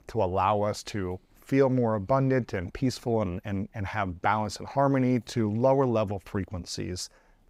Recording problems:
none

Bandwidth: 15.5 kHz